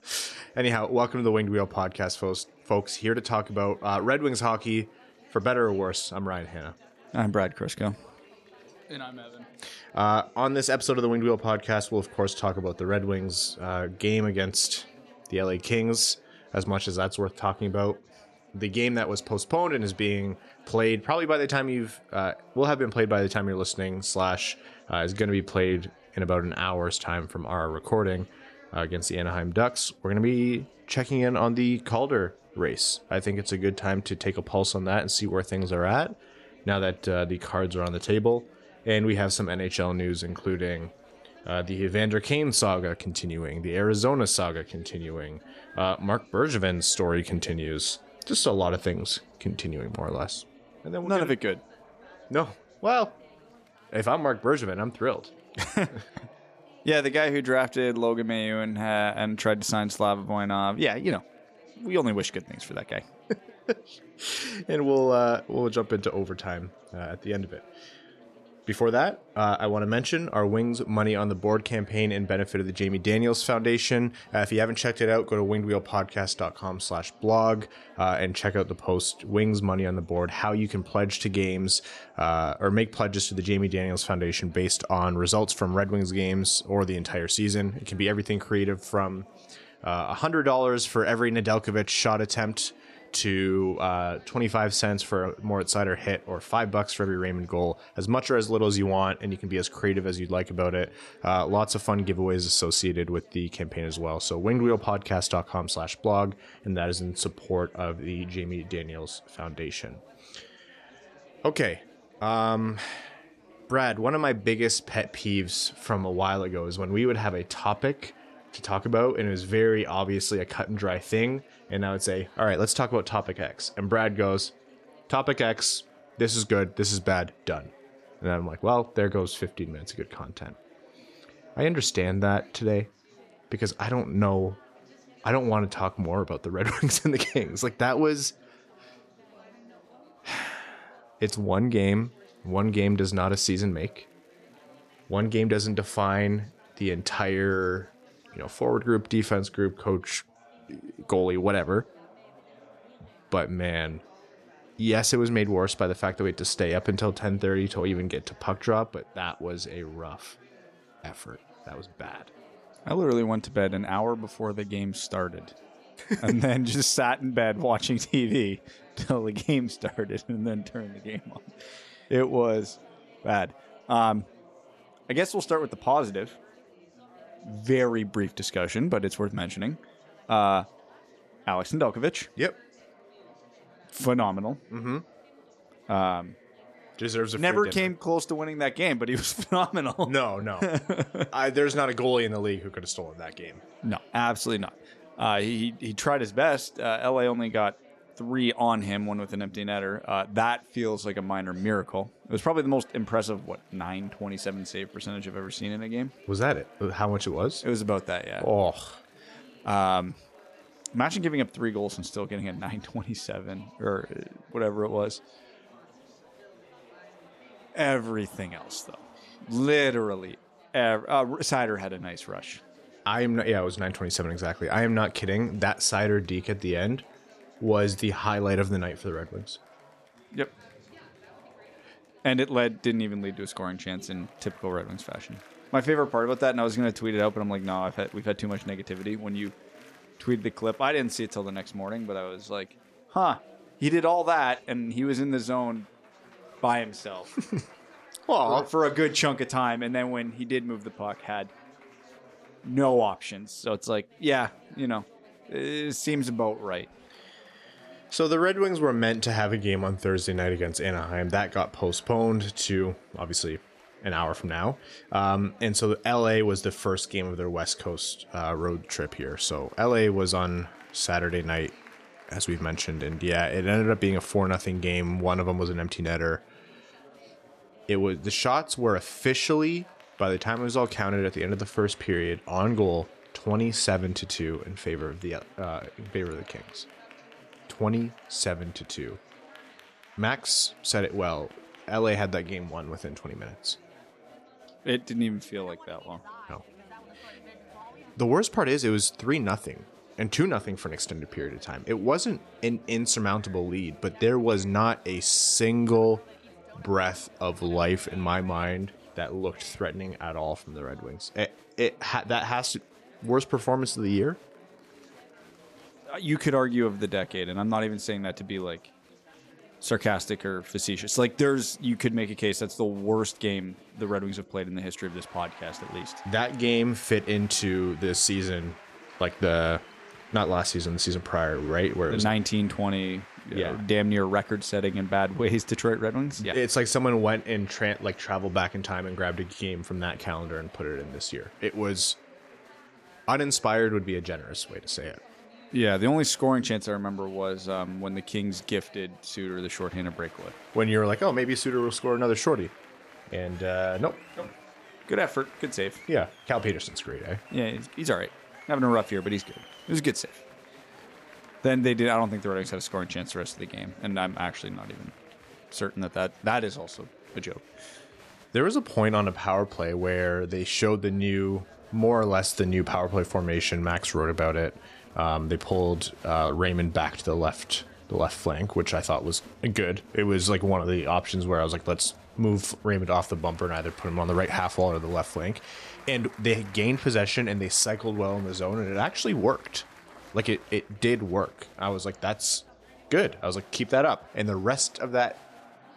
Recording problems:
chatter from many people; faint; throughout; 25 dB below the speech

